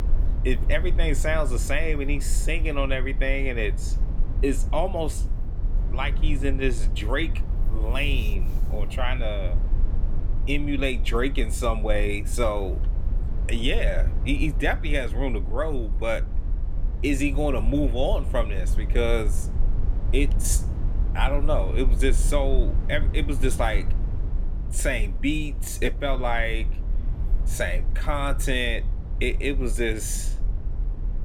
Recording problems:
low rumble; noticeable; throughout; 15 dB below the speech

